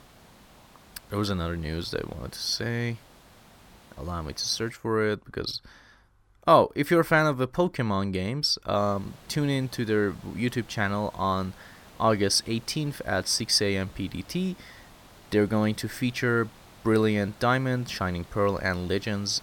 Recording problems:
hiss; faint; until 4.5 s and from 9 s on; 25 dB below the speech

